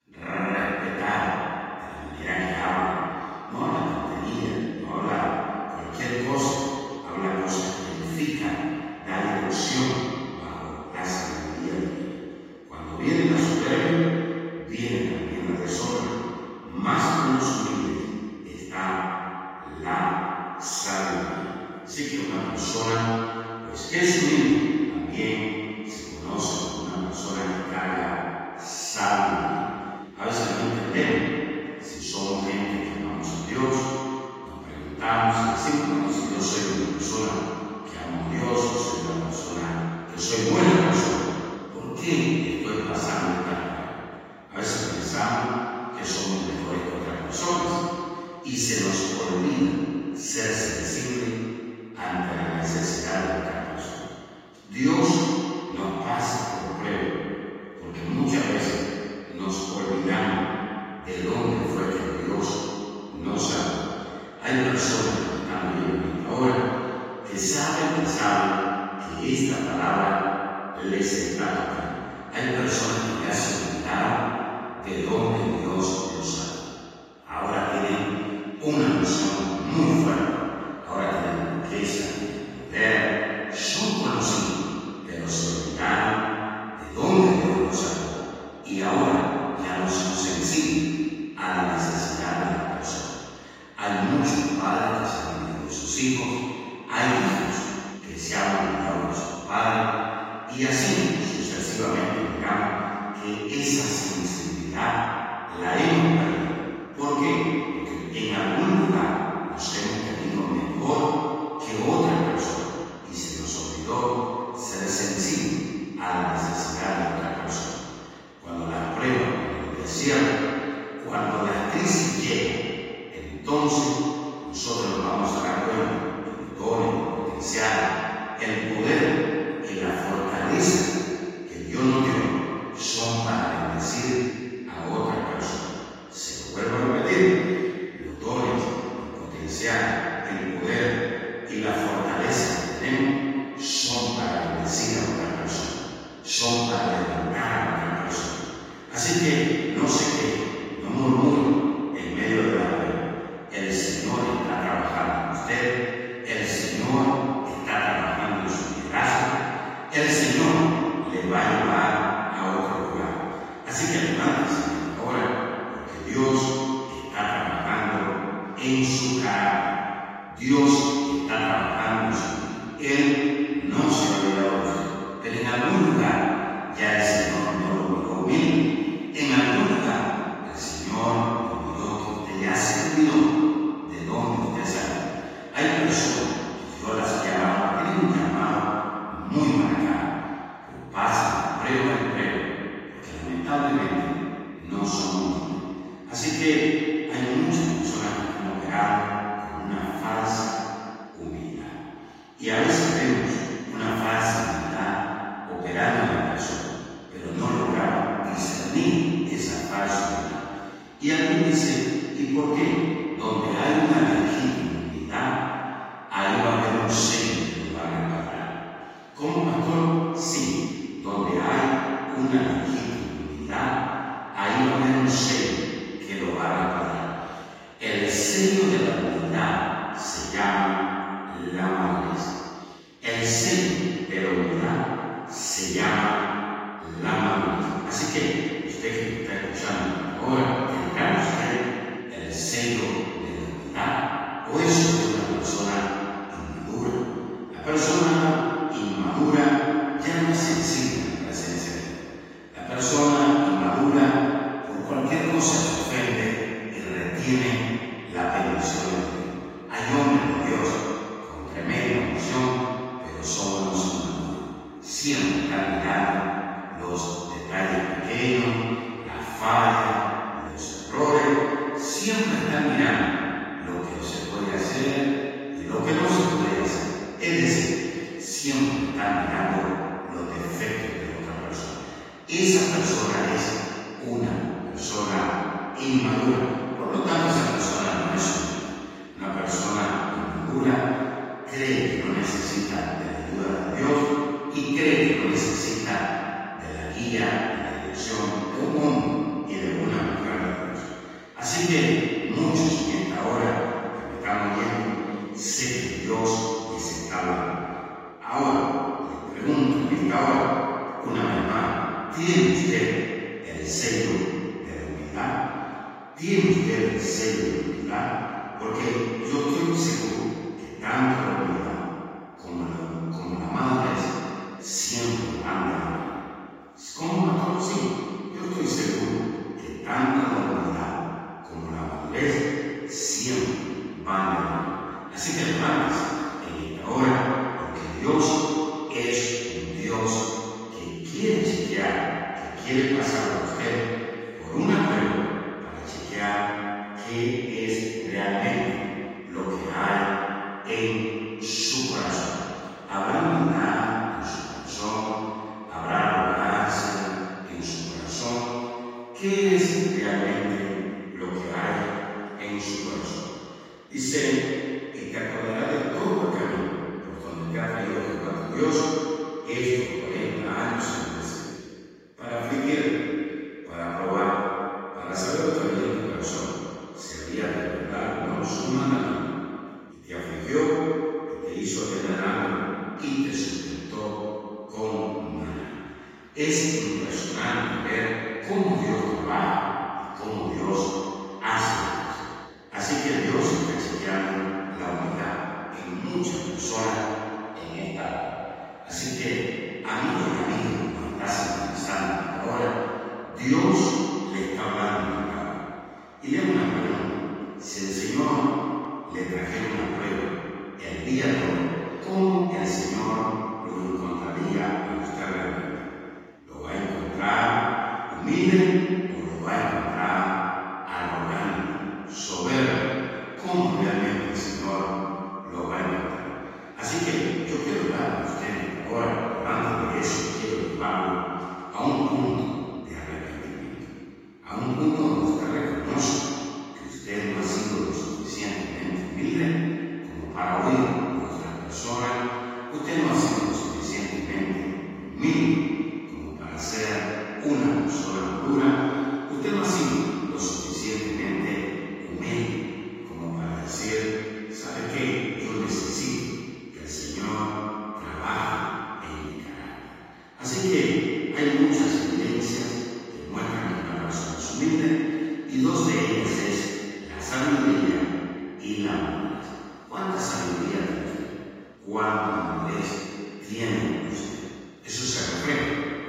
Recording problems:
room echo; strong; dies away in 2.1 s
off-mic speech; far
garbled, watery; slightly; nothing above 15.5 kHz

